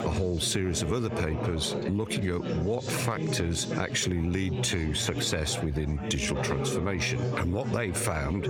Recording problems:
squashed, flat; heavily, background pumping
chatter from many people; loud; throughout; 5 dB below the speech

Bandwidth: 17 kHz